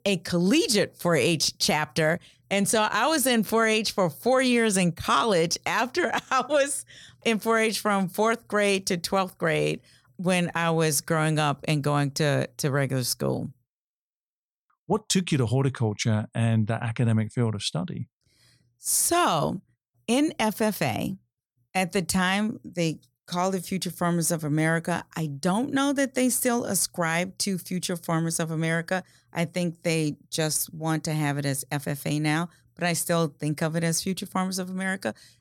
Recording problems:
none

